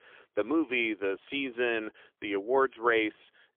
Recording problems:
phone-call audio; poor line; nothing above 3.5 kHz

